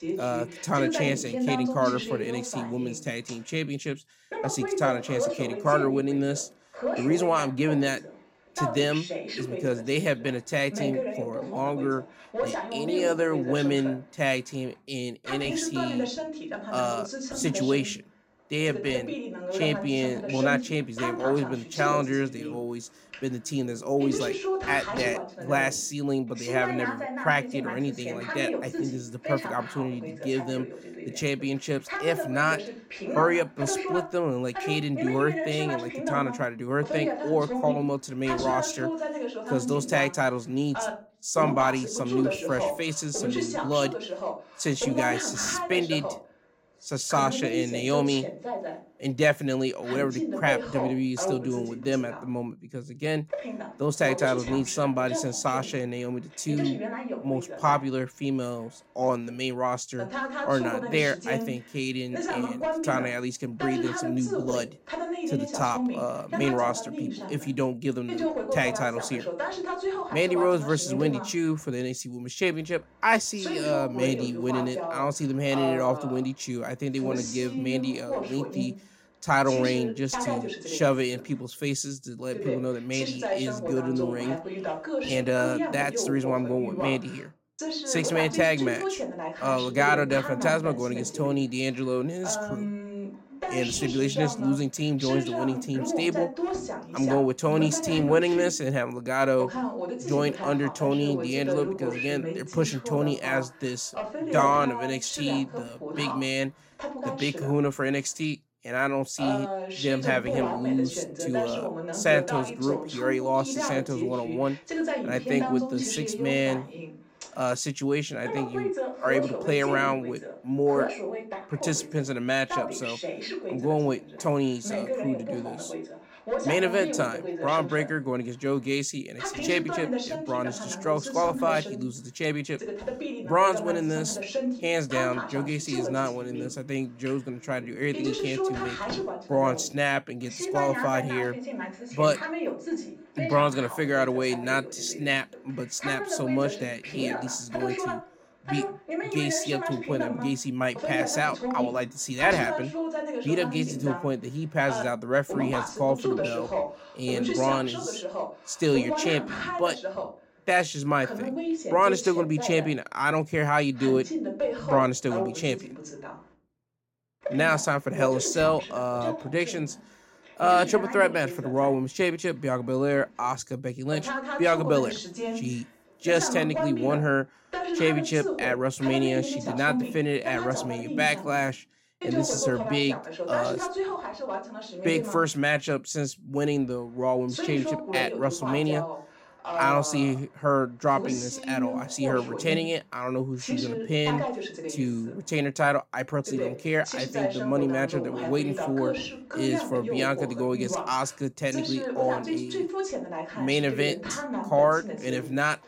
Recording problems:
voice in the background; loud; throughout; 5 dB below the speech

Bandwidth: 16 kHz